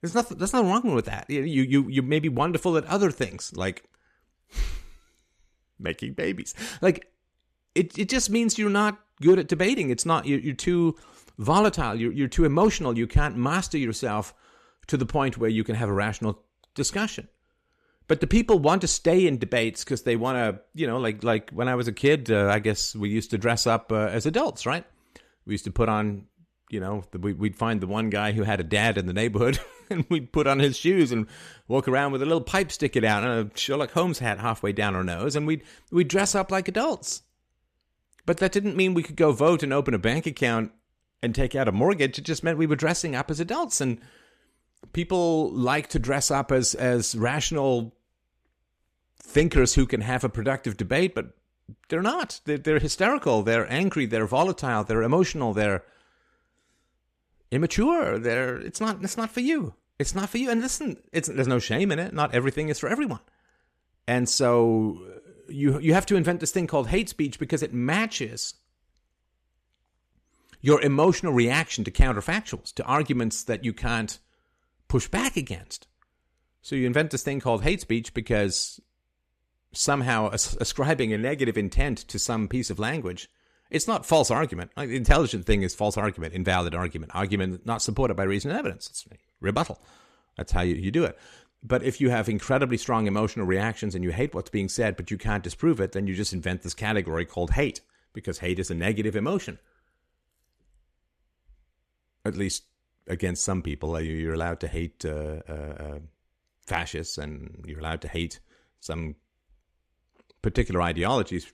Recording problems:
none

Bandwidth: 14.5 kHz